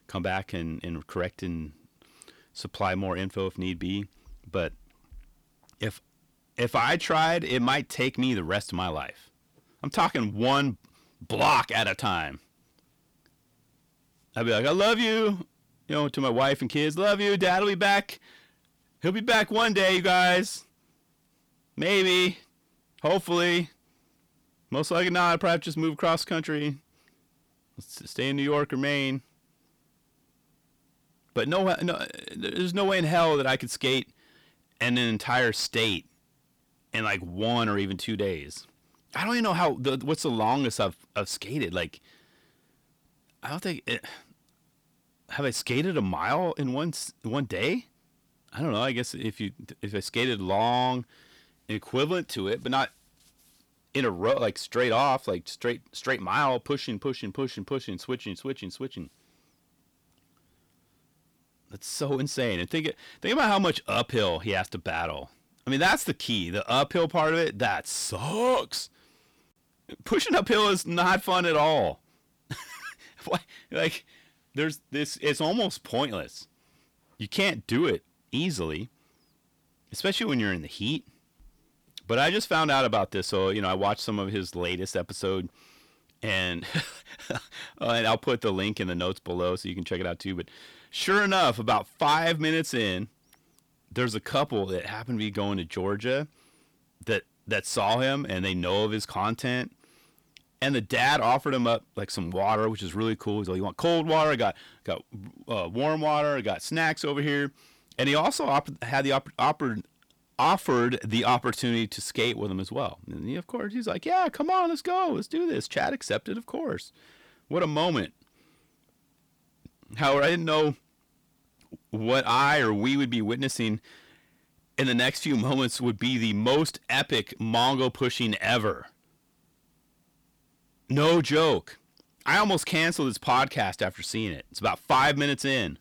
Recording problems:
distortion; heavy; 7 dB below the speech

